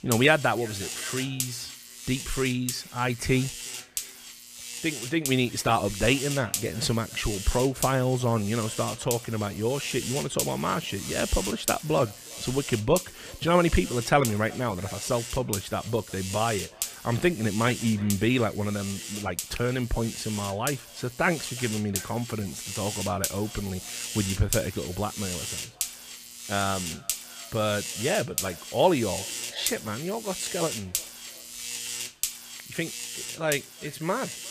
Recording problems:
echo of what is said; faint; throughout; 360 ms later, 25 dB below the speech
electrical hum; loud; throughout; 60 Hz, 7 dB below the speech

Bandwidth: 14.5 kHz